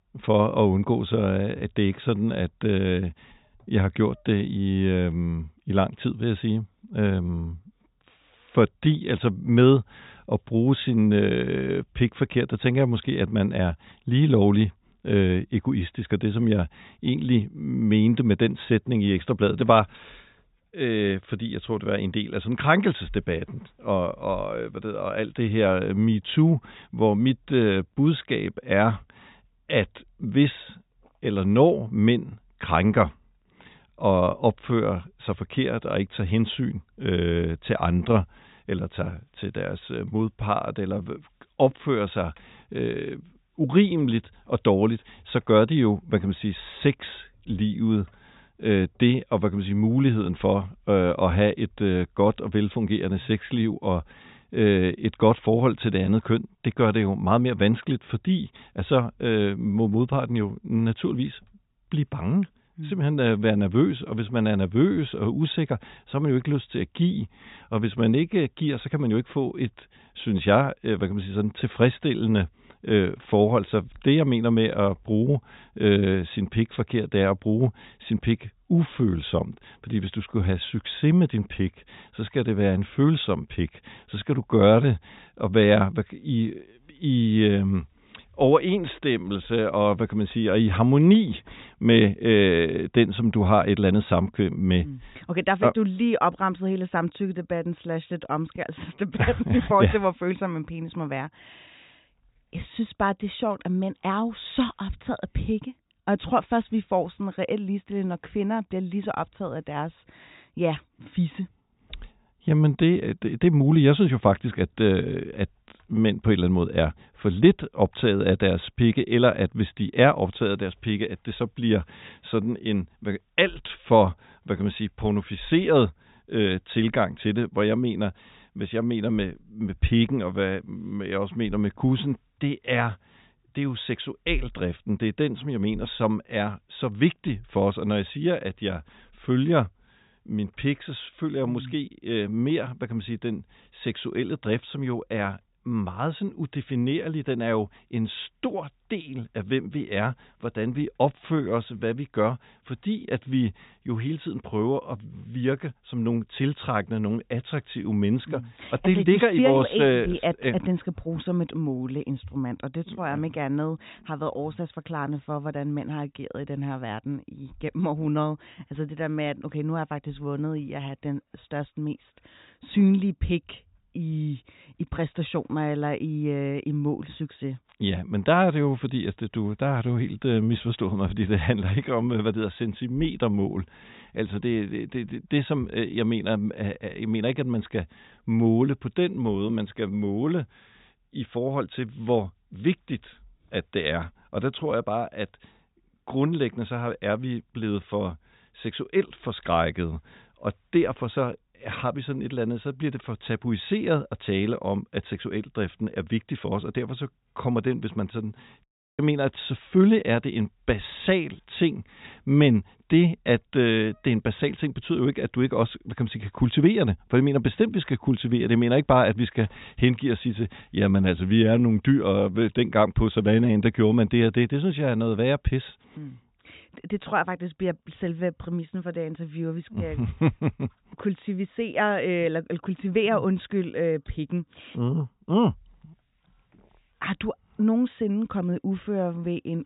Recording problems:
high frequencies cut off; severe; nothing above 4 kHz

